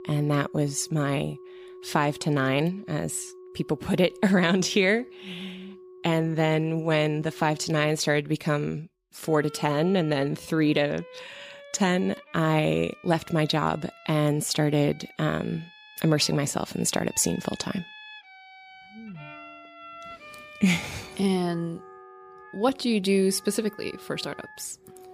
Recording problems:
background music; faint; throughout; 20 dB below the speech

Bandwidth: 15 kHz